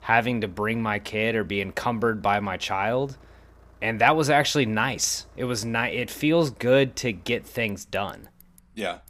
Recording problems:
traffic noise; faint; throughout; 30 dB below the speech

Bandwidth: 15 kHz